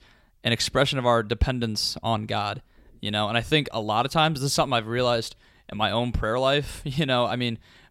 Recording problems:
none

